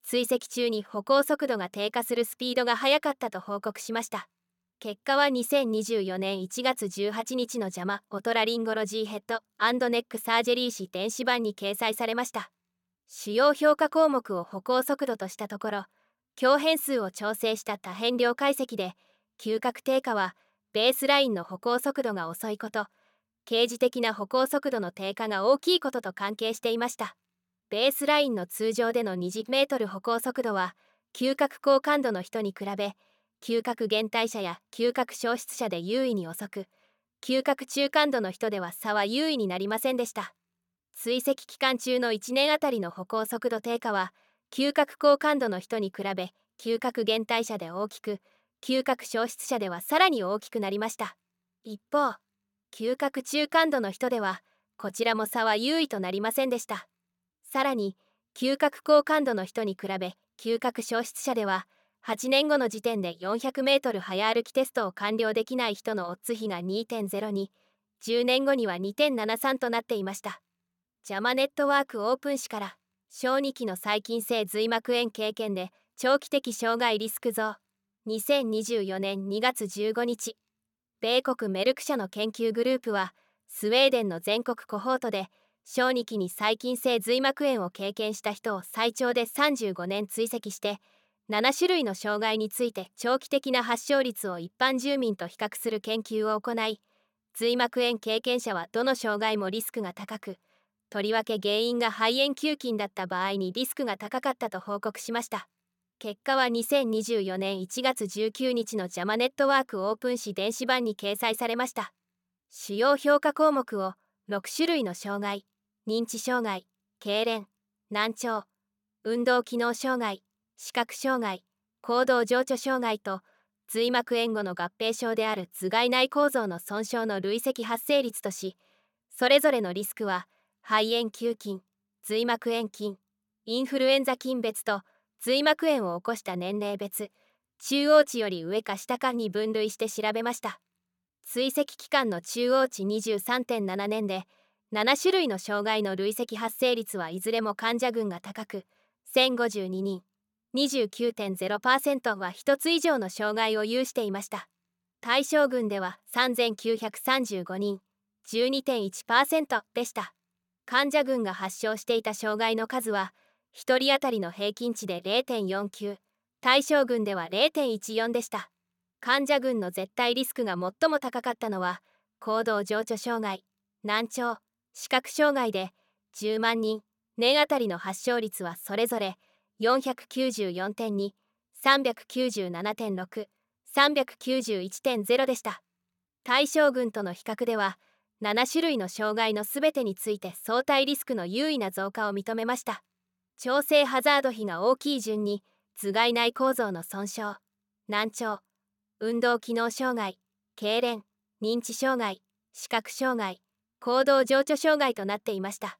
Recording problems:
none

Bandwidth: 18 kHz